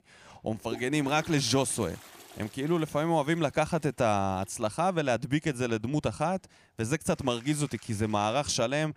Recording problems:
household noises; noticeable; throughout; 20 dB below the speech

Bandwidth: 15 kHz